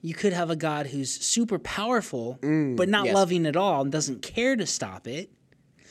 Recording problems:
none

